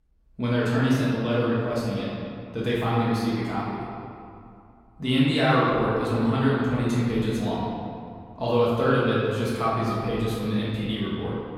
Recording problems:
room echo; strong; dies away in 2.1 s
off-mic speech; far

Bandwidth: 16.5 kHz